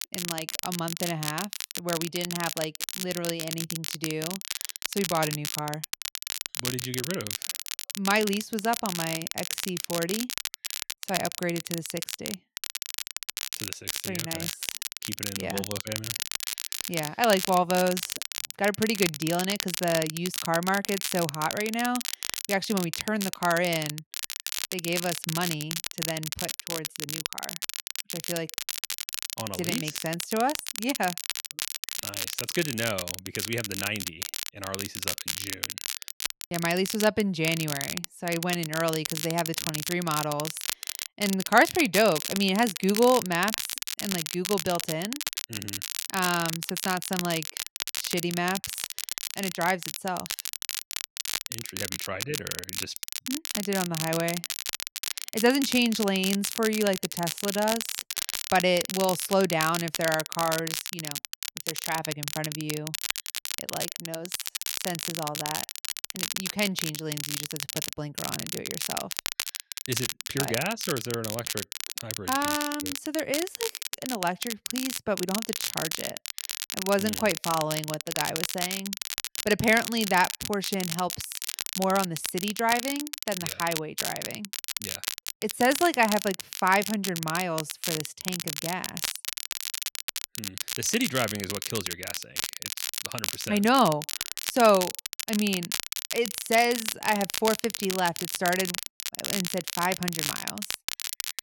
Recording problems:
crackle, like an old record; loud; 3 dB below the speech

